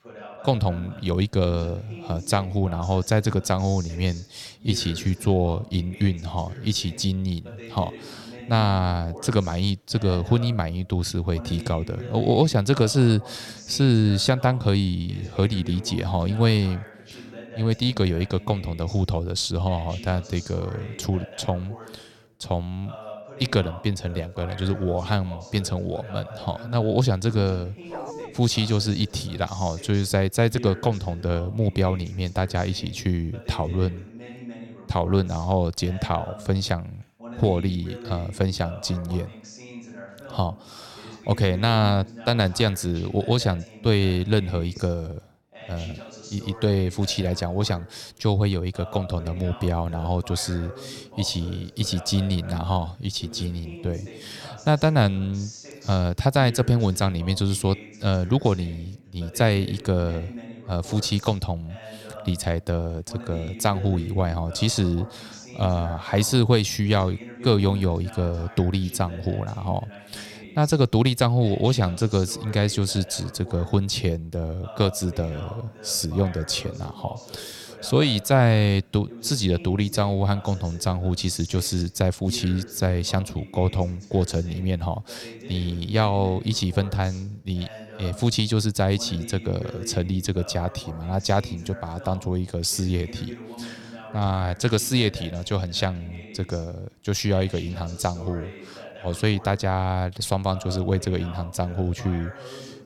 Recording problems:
voice in the background; noticeable; throughout; 15 dB below the speech
dog barking; faint; at 28 s; peak 10 dB below the speech

